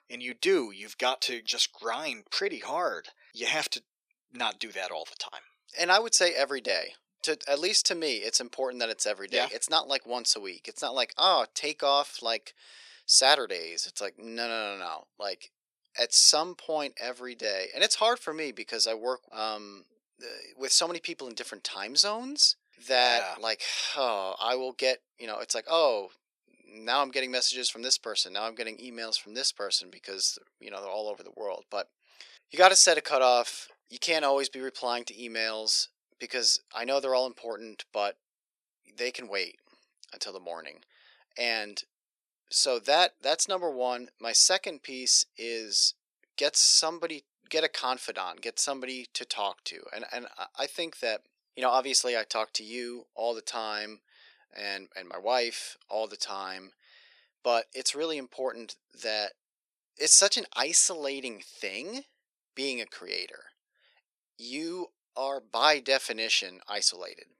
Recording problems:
thin; very; fading below 400 Hz

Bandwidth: 14.5 kHz